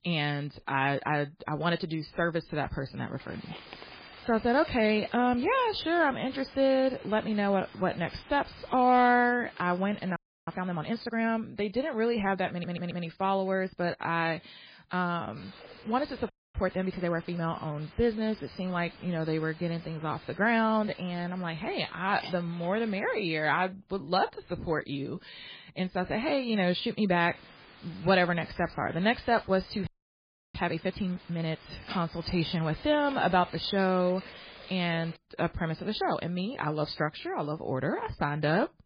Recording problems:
garbled, watery; badly; nothing above 4.5 kHz
hiss; noticeable; from 3 to 11 s, from 15 to 23 s and from 27 to 35 s; 20 dB below the speech
audio freezing; at 10 s, at 16 s and at 30 s for 0.5 s
audio stuttering; at 13 s

